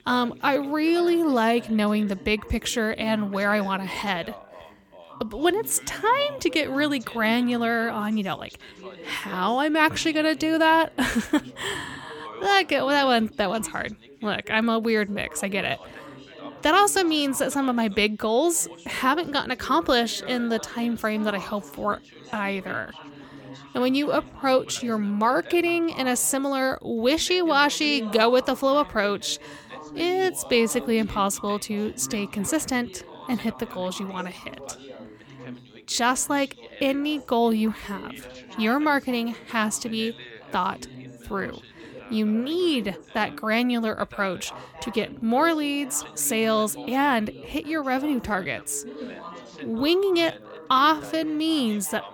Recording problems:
background chatter; noticeable; throughout; 3 voices, 20 dB below the speech

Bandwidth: 17.5 kHz